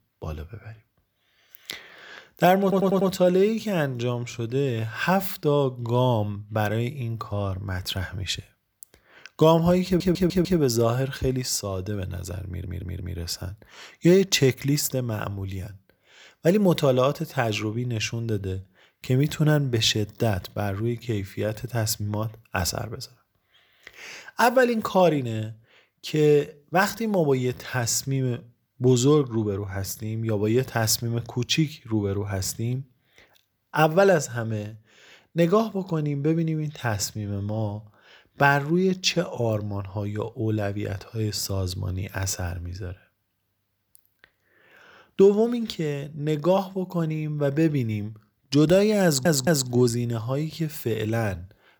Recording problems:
audio stuttering; 4 times, first at 2.5 s

